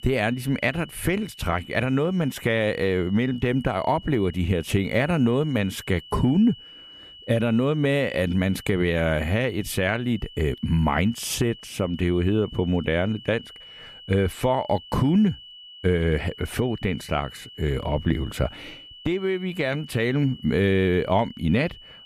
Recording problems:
high-pitched whine; noticeable; throughout; 3 kHz, 20 dB below the speech

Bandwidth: 14.5 kHz